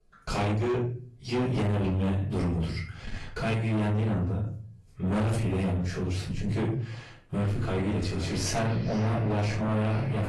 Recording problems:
distortion; heavy; 6 dB below the speech
off-mic speech; far
echo of what is said; noticeable; from 7.5 s on; 450 ms later, 15 dB below the speech
room echo; noticeable; dies away in 0.4 s
garbled, watery; slightly; nothing above 11.5 kHz

